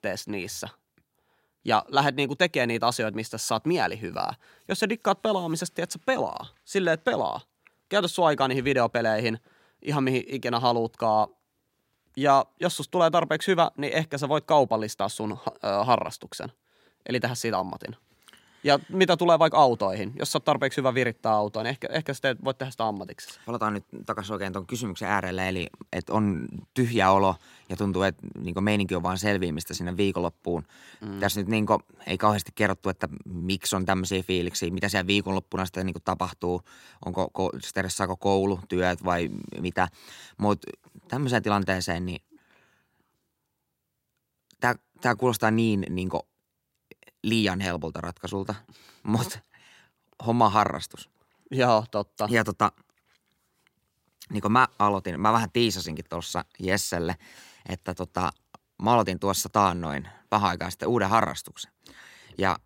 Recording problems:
none

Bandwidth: 16 kHz